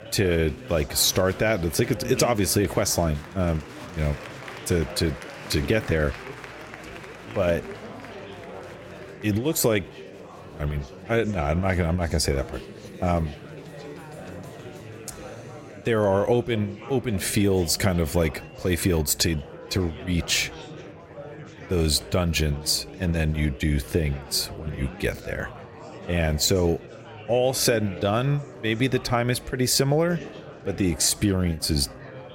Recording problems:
murmuring crowd; noticeable; throughout; 15 dB below the speech

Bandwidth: 16 kHz